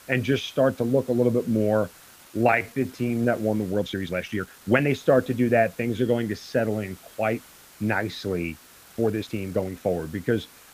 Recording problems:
muffled; slightly; fading above 2.5 kHz
hiss; faint; throughout; 25 dB below the speech
uneven, jittery; strongly; from 2 to 10 s

